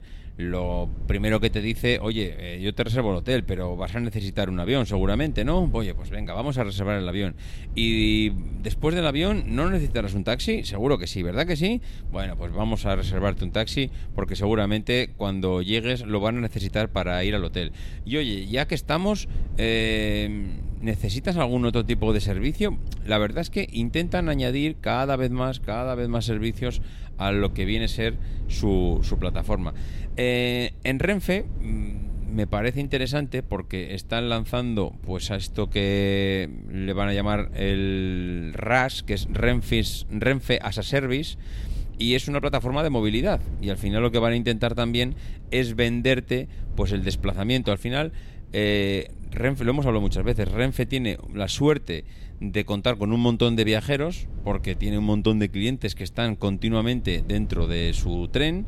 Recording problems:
low rumble; faint; throughout; 25 dB below the speech

